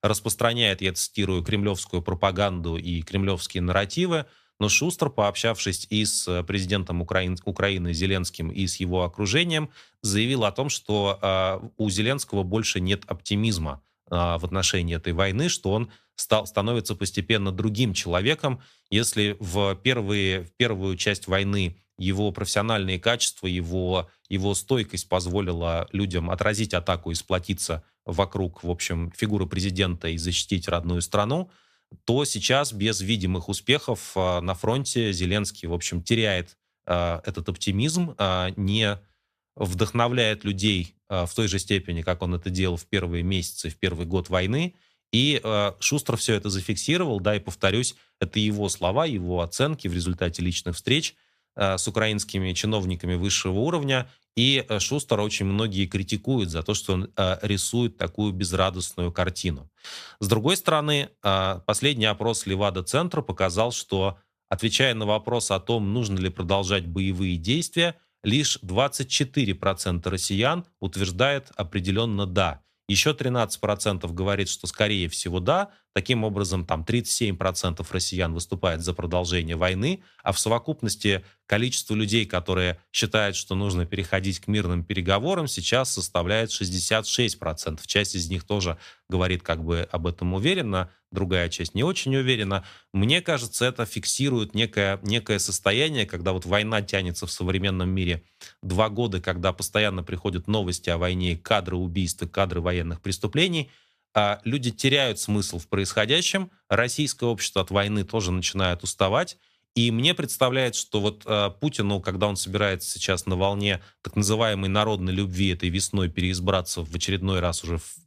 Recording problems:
none

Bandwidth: 14.5 kHz